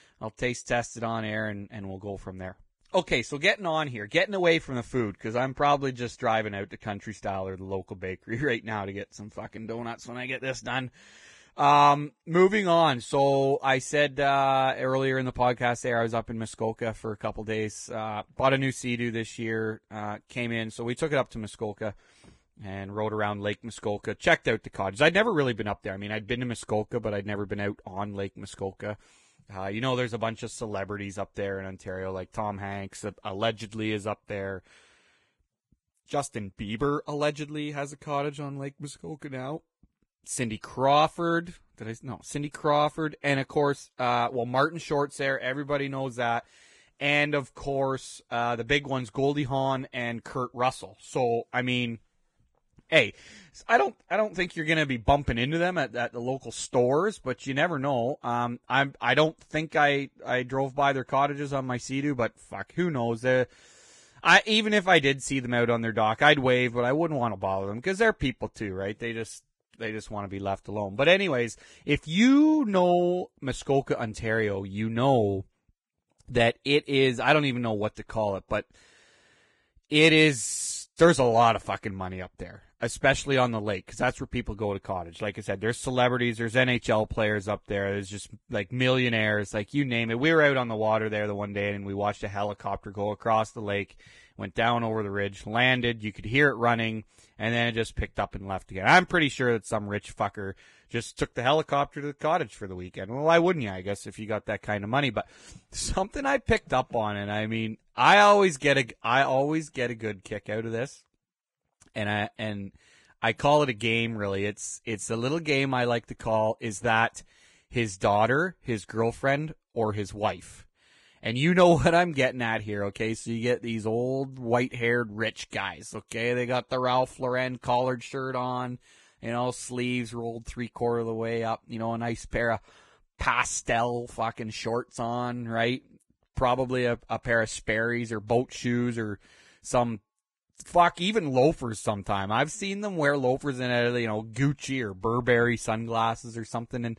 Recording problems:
garbled, watery; badly; nothing above 10 kHz

